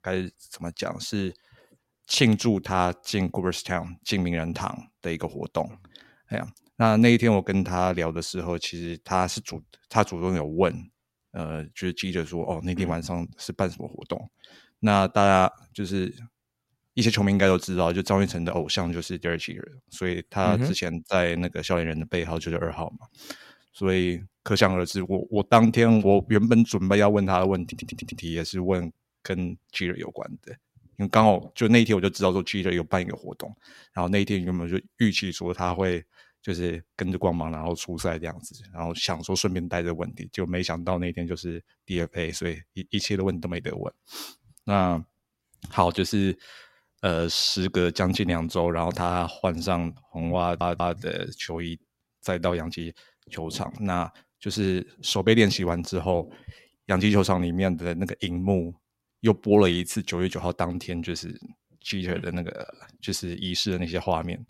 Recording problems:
audio stuttering; at 28 s and at 50 s

